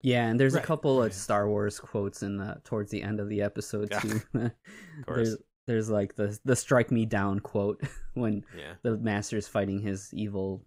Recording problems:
none

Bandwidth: 15.5 kHz